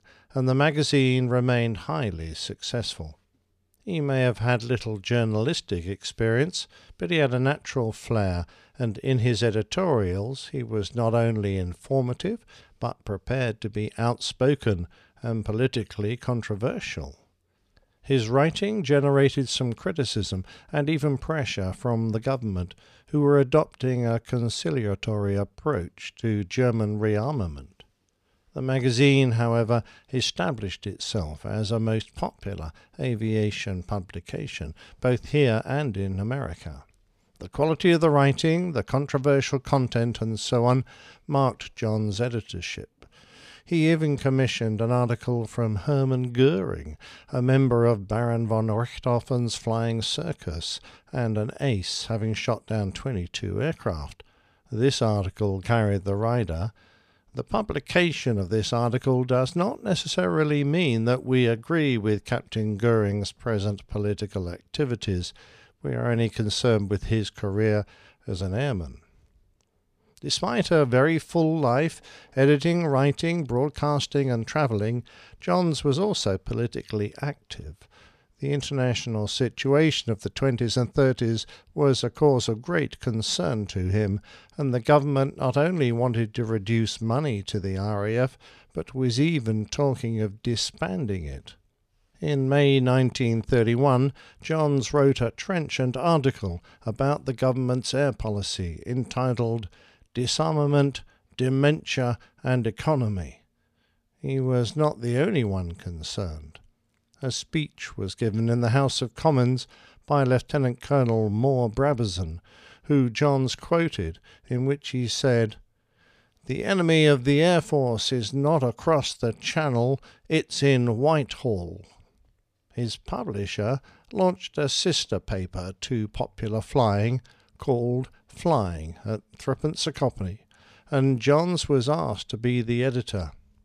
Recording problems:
none

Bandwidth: 14.5 kHz